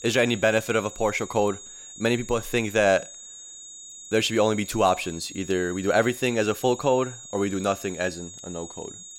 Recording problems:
high-pitched whine; noticeable; throughout; 6.5 kHz, 15 dB below the speech

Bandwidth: 16 kHz